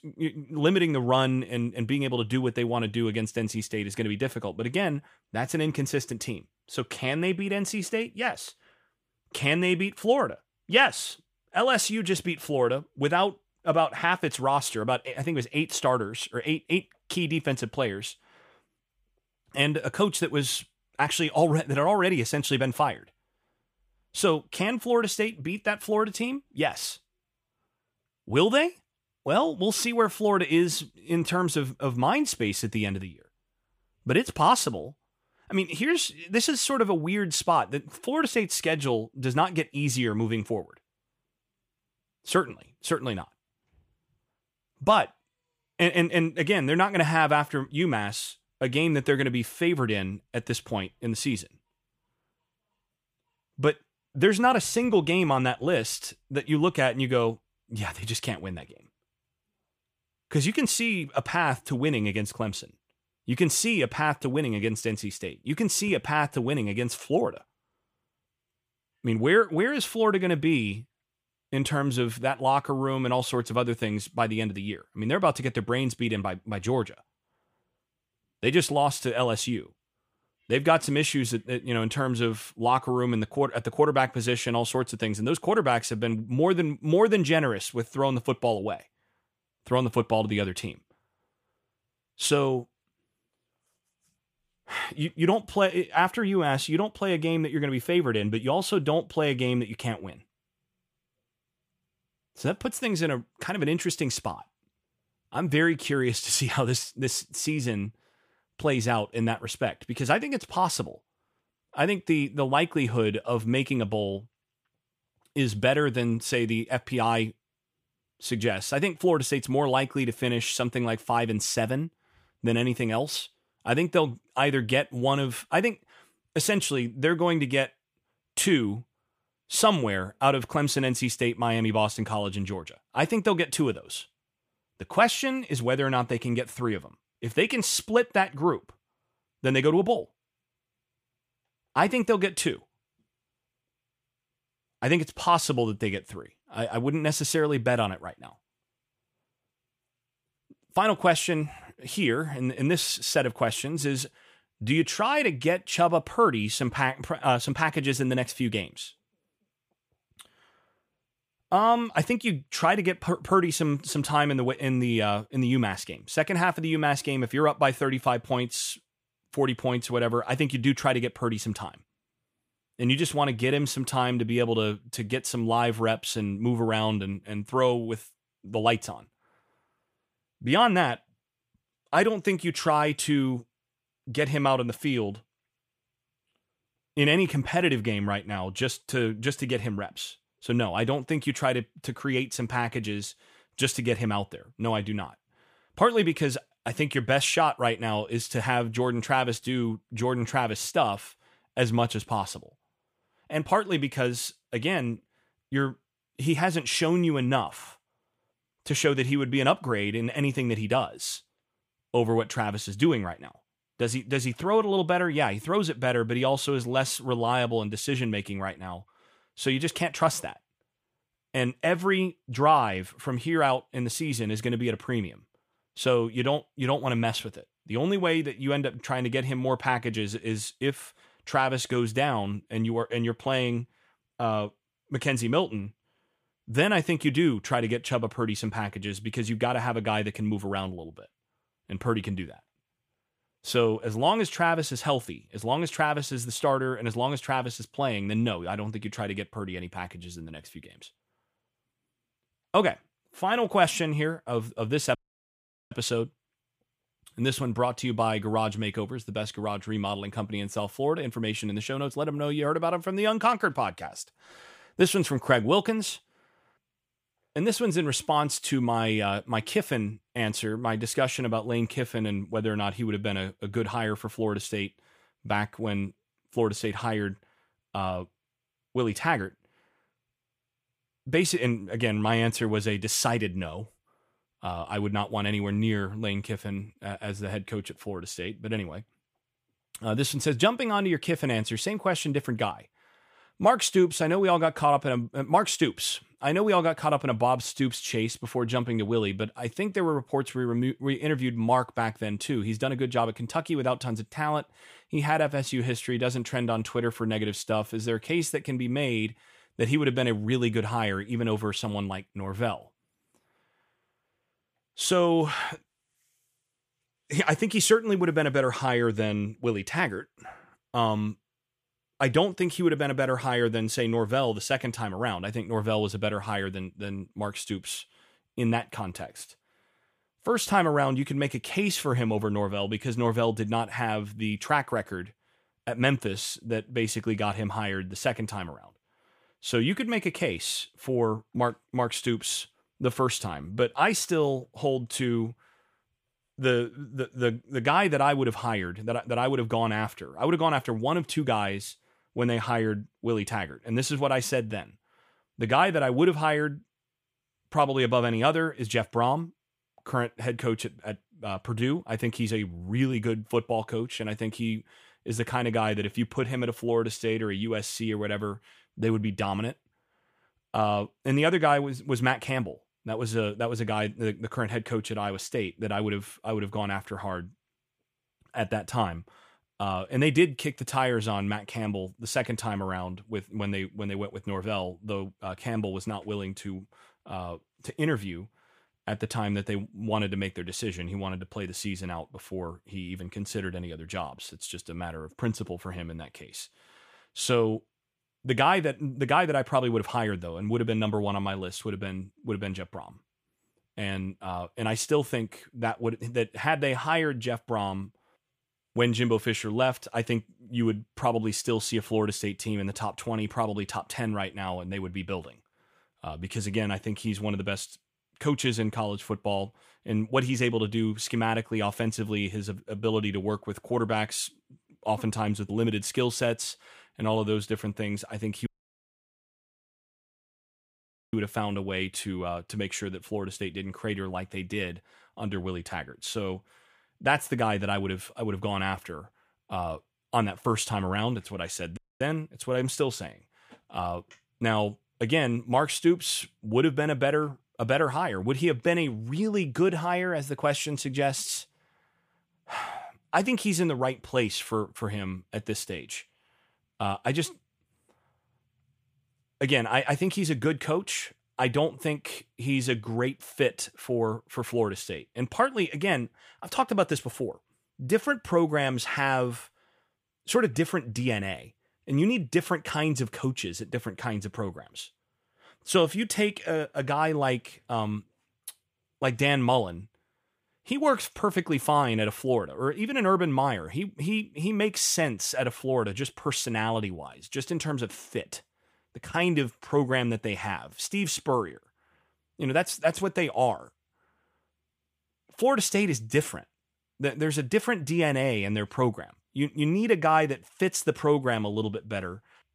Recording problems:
audio cutting out; at 4:15 for 1 s, at 7:08 for 2.5 s and at 7:22

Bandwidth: 15 kHz